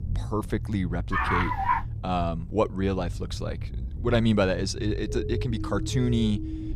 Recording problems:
low rumble; noticeable; throughout; 20 dB below the speech
dog barking; loud; at 1 s; peak 3 dB above the speech
siren; noticeable; from 5 s on; peak 8 dB below the speech

